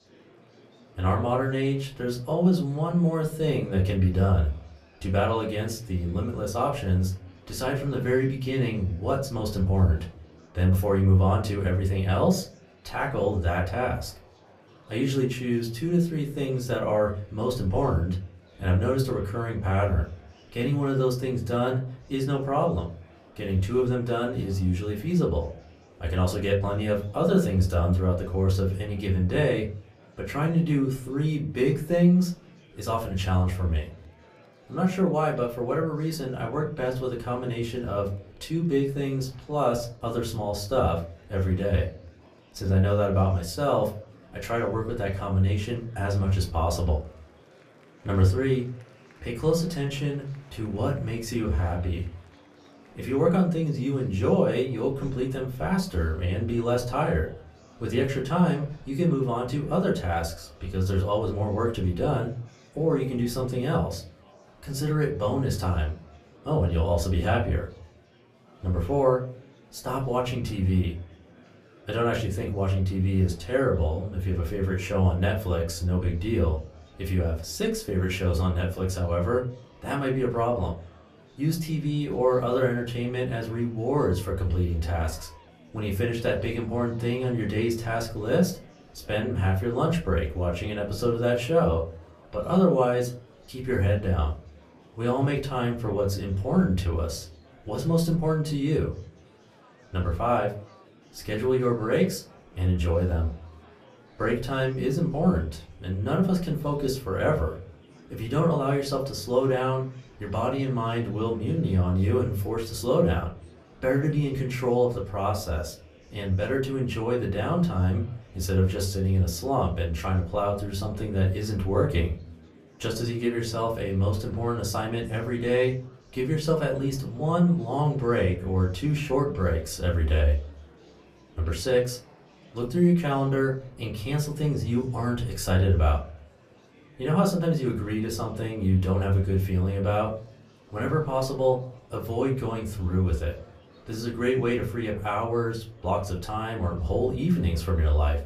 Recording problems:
off-mic speech; far
room echo; very slight; dies away in 0.3 s
murmuring crowd; faint; throughout; 25 dB below the speech

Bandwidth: 14.5 kHz